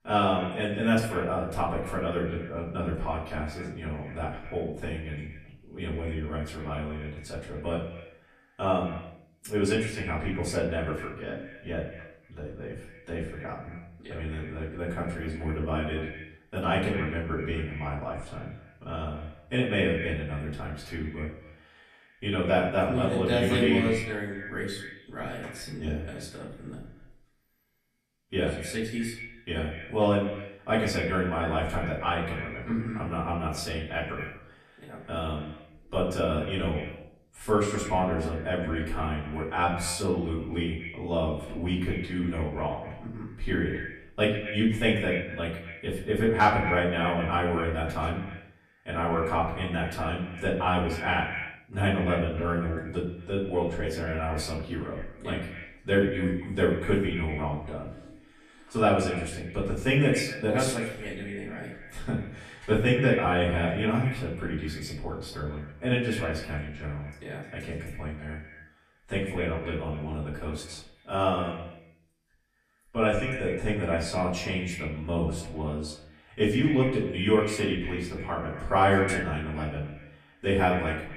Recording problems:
echo of what is said; strong; throughout; 120 ms later, 10 dB below the speech
off-mic speech; far
room echo; slight; dies away in 0.4 s

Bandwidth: 14 kHz